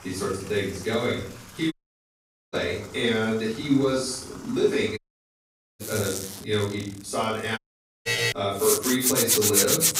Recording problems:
off-mic speech; far
room echo; noticeable; dies away in 0.5 s
household noises; very loud; throughout; 4 dB above the speech
audio cutting out; at 1.5 s for 1 s, at 5 s for 1 s and at 7.5 s
alarm; loud; at 8 s; peak 3 dB above the speech

